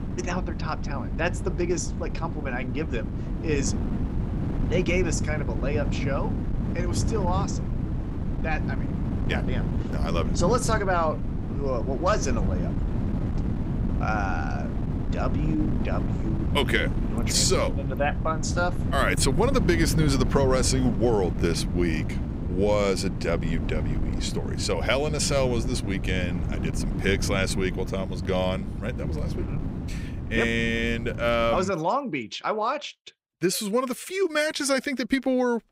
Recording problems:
wind noise on the microphone; occasional gusts; until 32 s; 10 dB below the speech

